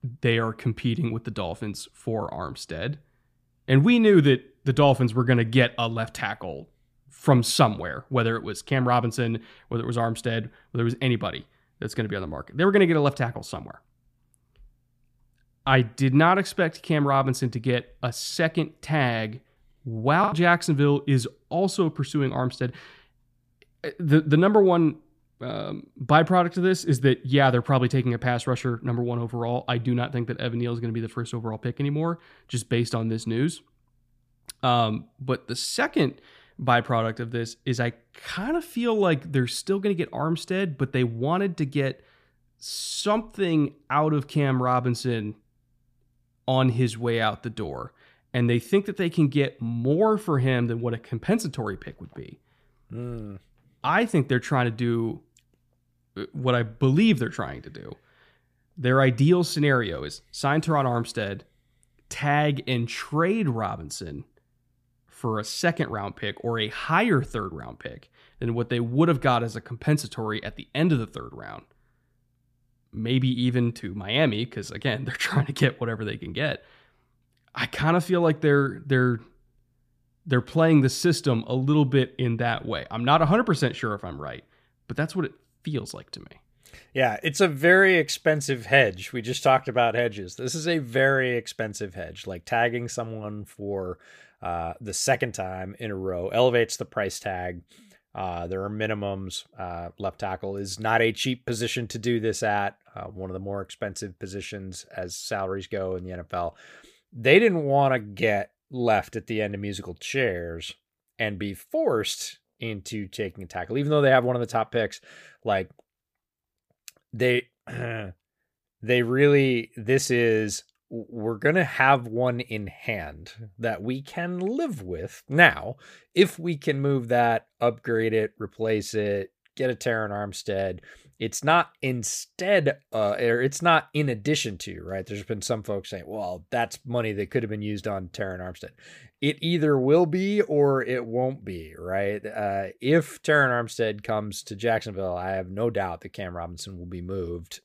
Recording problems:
choppy; very; at 20 s; 7% of the speech affected

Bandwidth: 15 kHz